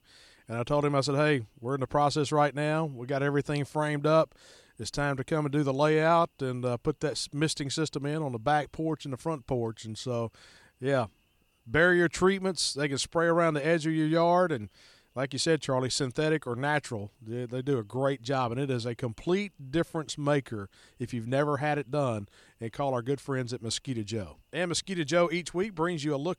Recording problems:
none

